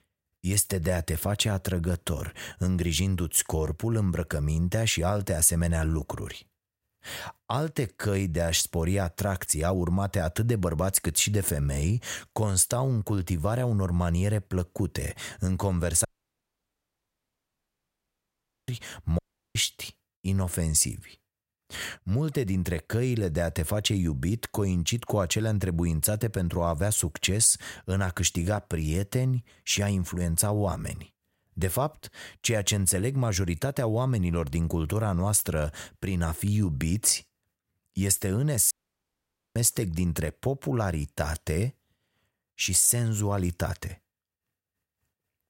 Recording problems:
audio cutting out; at 16 s for 2.5 s, at 19 s and at 39 s for 1 s

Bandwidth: 16 kHz